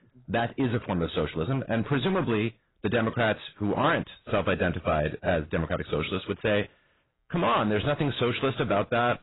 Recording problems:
garbled, watery; badly; nothing above 4 kHz
distortion; slight; 8% of the sound clipped

